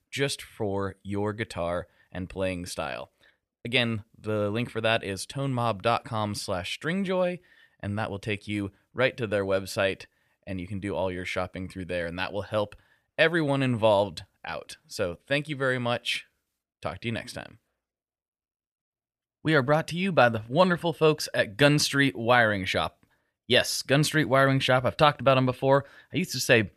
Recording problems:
none

